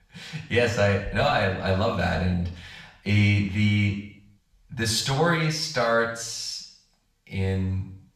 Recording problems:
off-mic speech; far
room echo; noticeable; dies away in 0.6 s

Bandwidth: 14 kHz